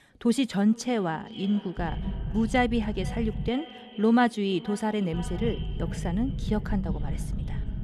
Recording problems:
echo of what is said; noticeable; throughout; 470 ms later, 20 dB below the speech
low rumble; noticeable; from 2 to 3.5 s and from 5 s on; 15 dB below the speech

